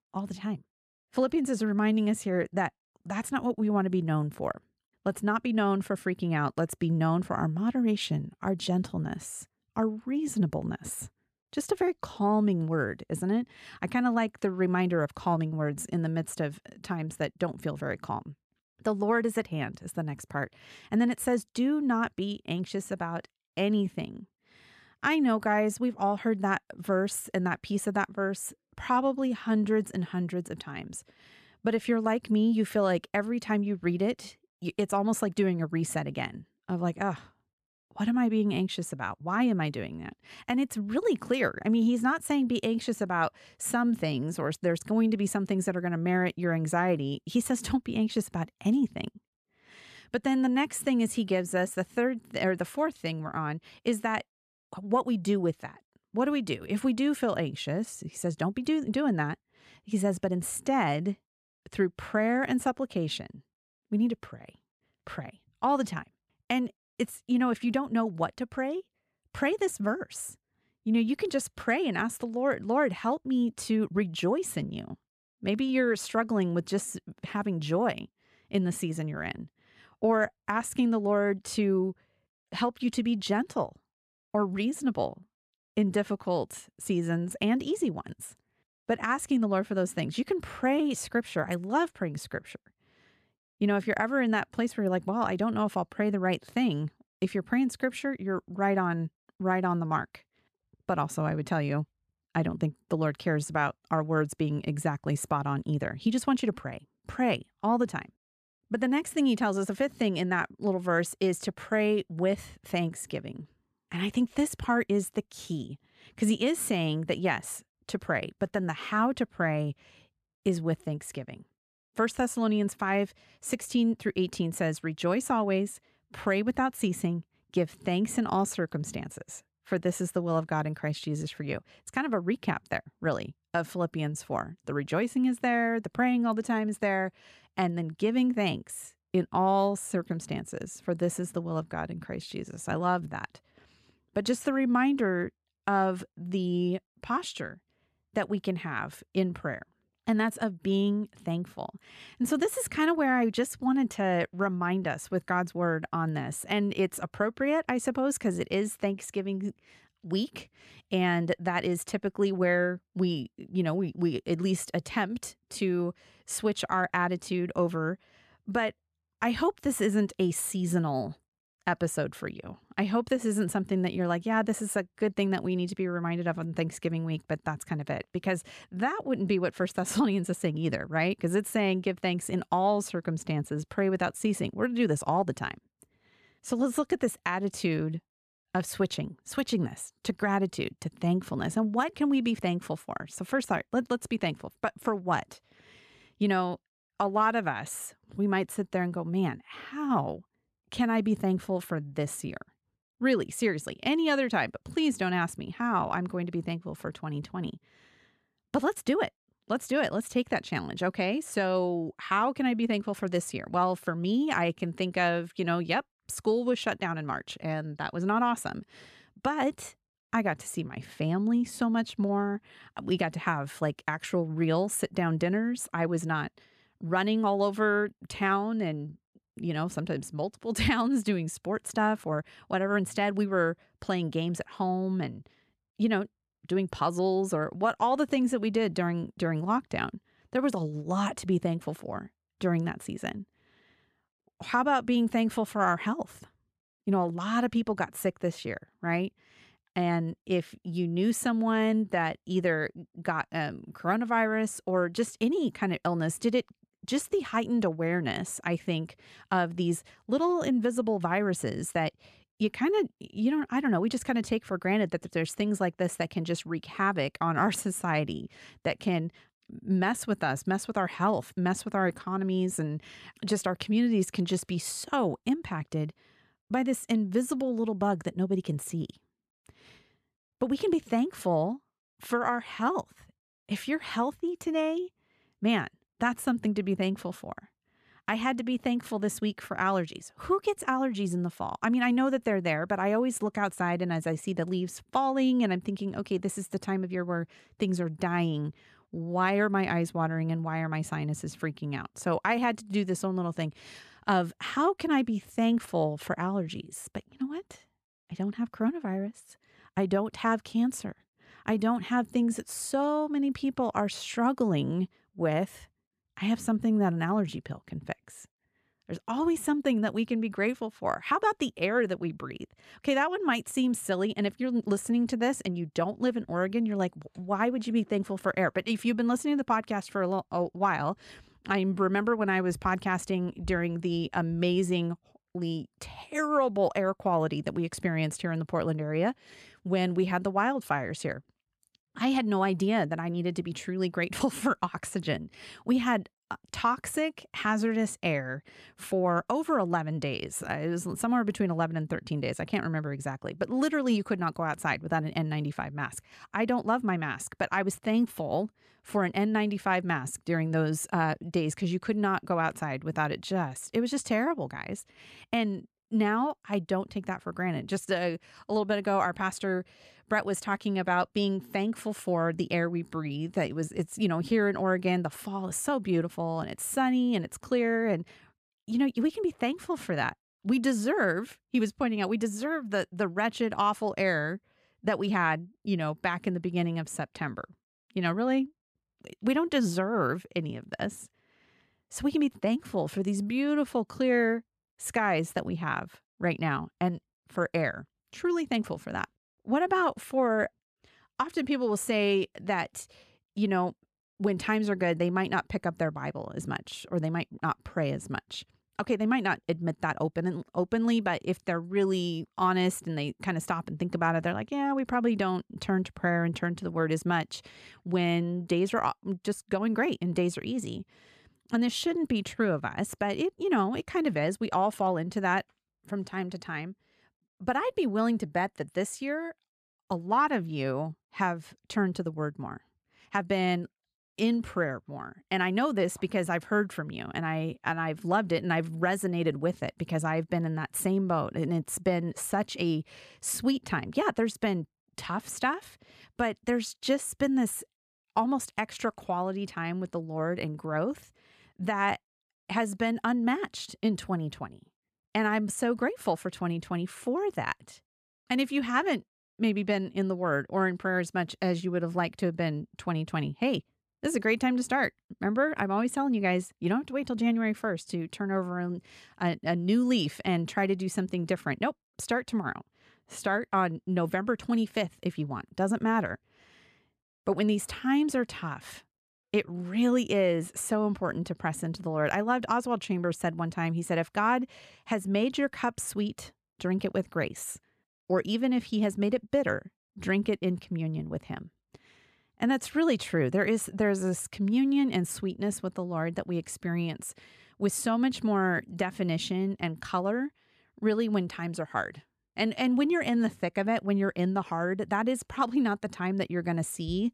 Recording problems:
uneven, jittery; strongly; from 39 s to 7:14

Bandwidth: 14 kHz